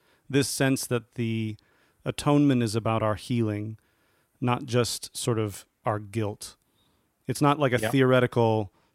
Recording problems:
none

